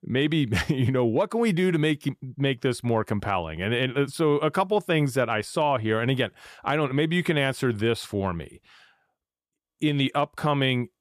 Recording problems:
none

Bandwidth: 14.5 kHz